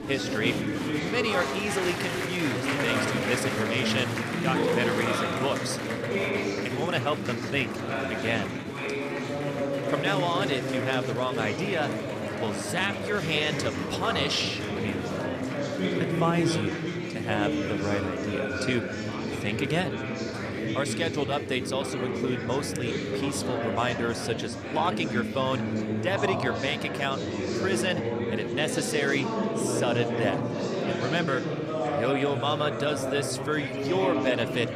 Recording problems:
murmuring crowd; very loud; throughout; as loud as the speech

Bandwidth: 14 kHz